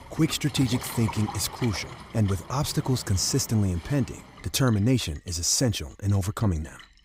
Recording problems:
rain or running water; noticeable; throughout; 15 dB below the speech

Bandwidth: 15.5 kHz